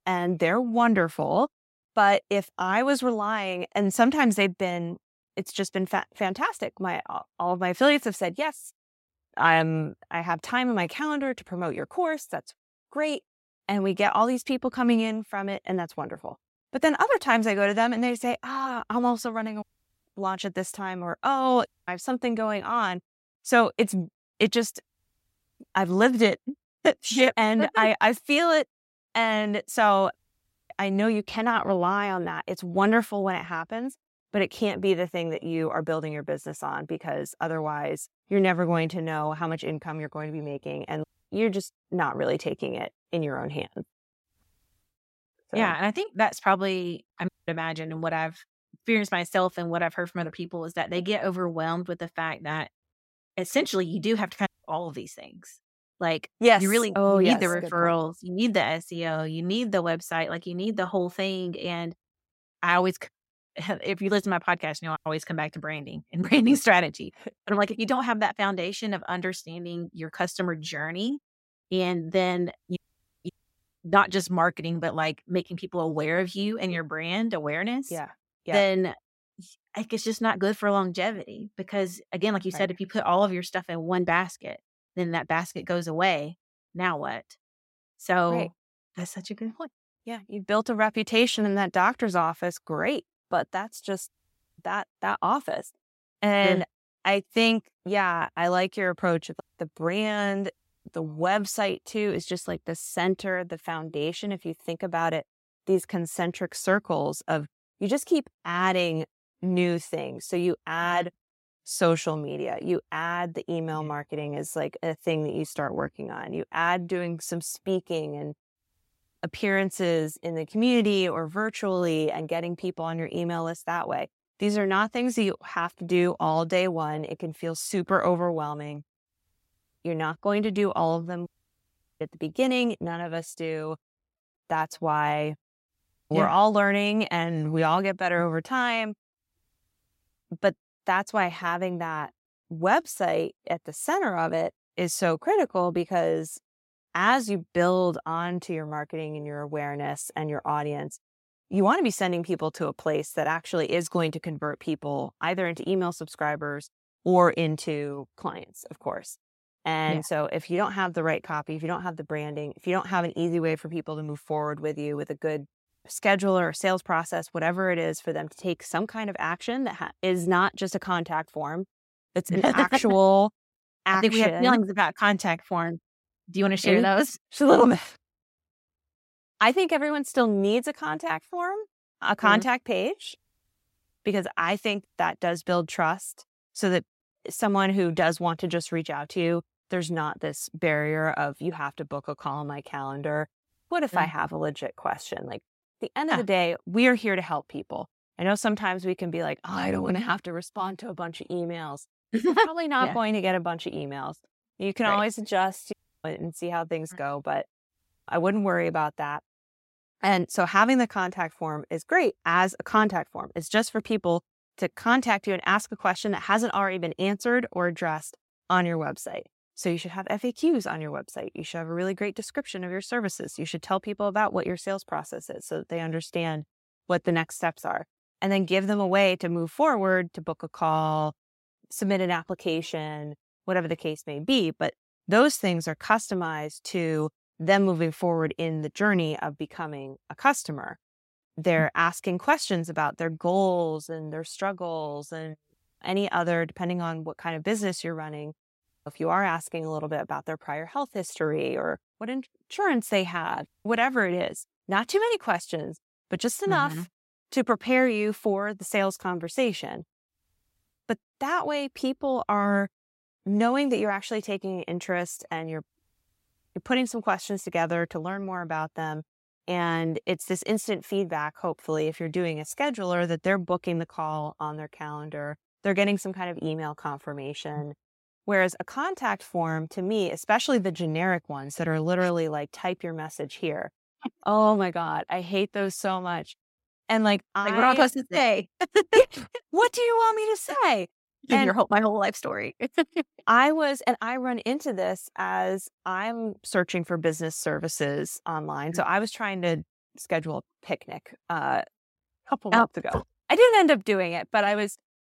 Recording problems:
none

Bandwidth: 16 kHz